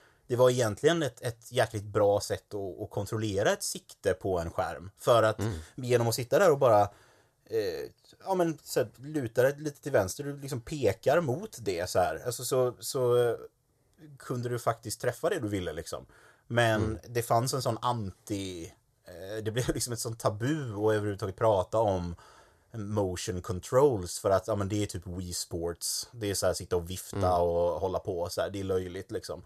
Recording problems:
none

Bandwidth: 14 kHz